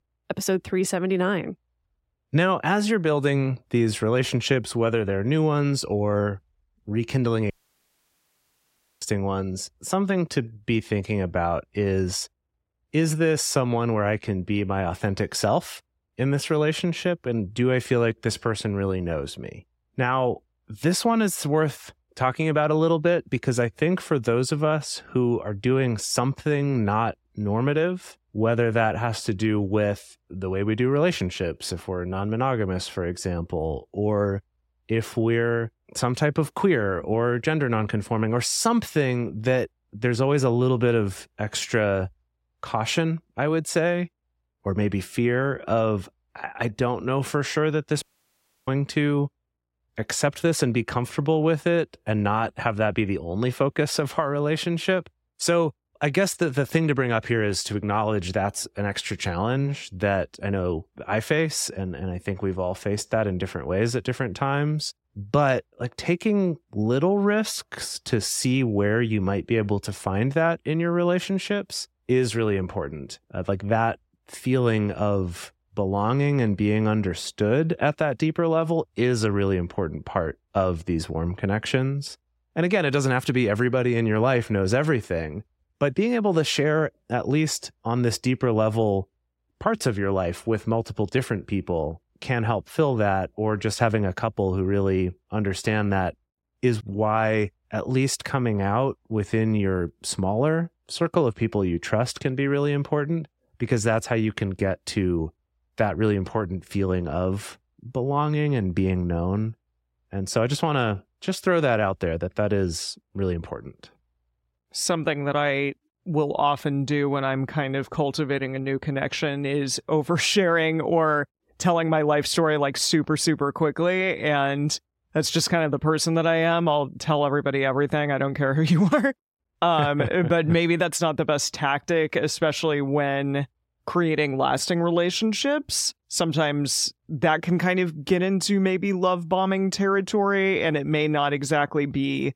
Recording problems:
audio cutting out; at 7.5 s for 1.5 s and at 48 s for 0.5 s

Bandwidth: 16 kHz